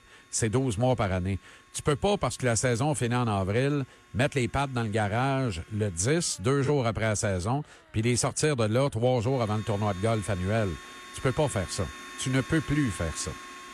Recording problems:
household noises; noticeable; throughout; 15 dB below the speech

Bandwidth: 13.5 kHz